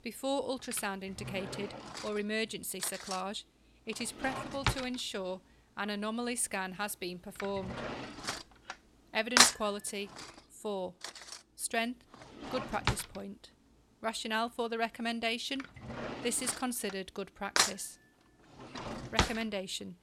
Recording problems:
household noises; very loud; throughout; 3 dB above the speech

